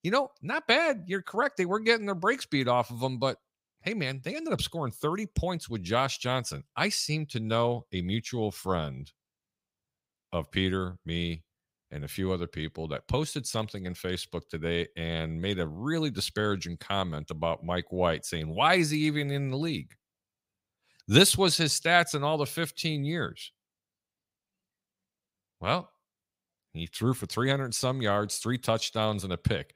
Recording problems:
none

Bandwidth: 15.5 kHz